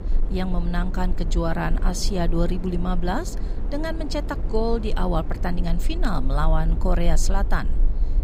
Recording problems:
wind noise on the microphone; occasional gusts; 15 dB below the speech
low rumble; faint; throughout; 25 dB below the speech

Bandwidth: 15.5 kHz